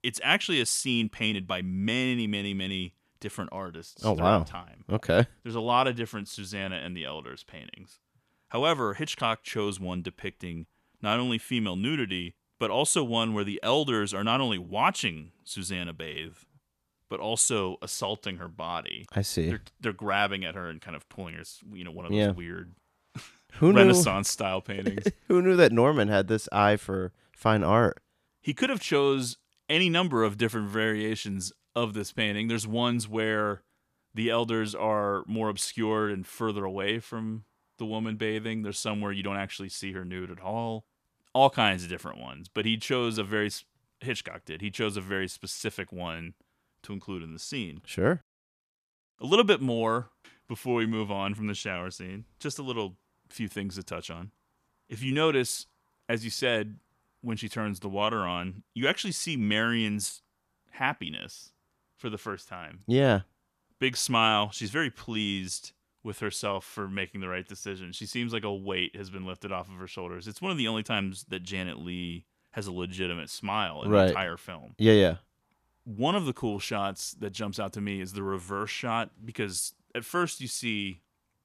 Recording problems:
none

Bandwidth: 14.5 kHz